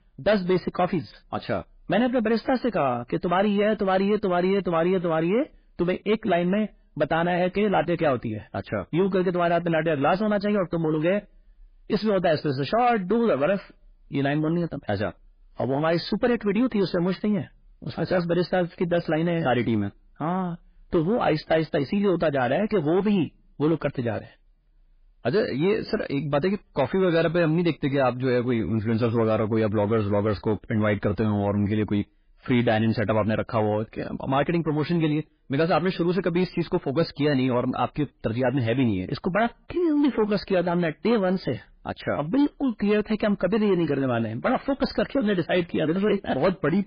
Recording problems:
garbled, watery; badly; nothing above 5 kHz
distortion; slight; 10 dB below the speech

